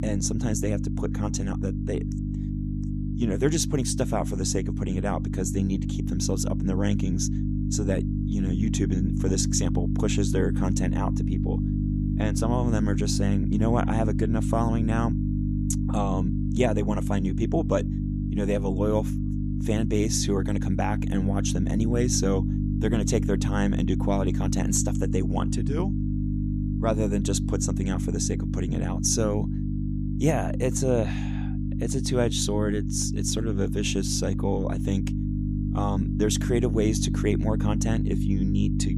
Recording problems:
electrical hum; loud; throughout; 50 Hz, 6 dB below the speech

